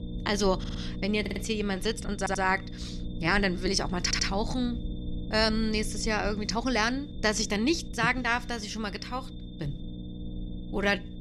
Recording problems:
low rumble; noticeable; throughout; 20 dB below the speech
high-pitched whine; faint; throughout; 3.5 kHz, 25 dB below the speech
audio stuttering; 4 times, first at 0.5 s
uneven, jittery; strongly; from 2 to 10 s

